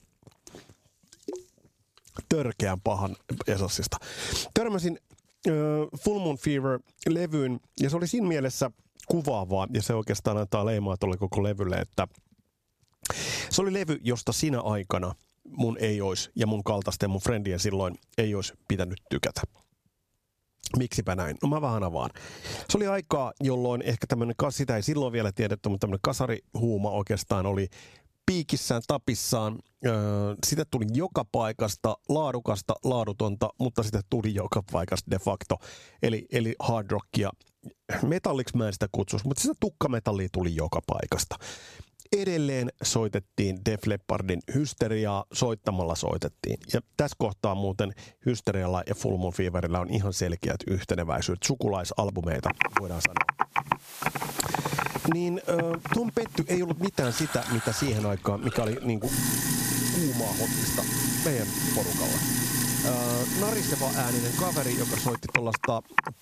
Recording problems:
squashed, flat; somewhat, background pumping
household noises; very loud; from 53 s on; 1 dB above the speech

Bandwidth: 14.5 kHz